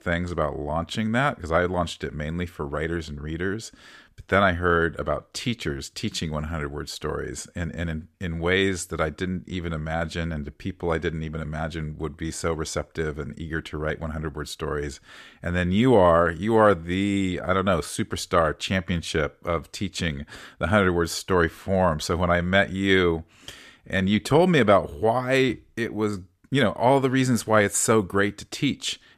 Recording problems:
none

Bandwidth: 14.5 kHz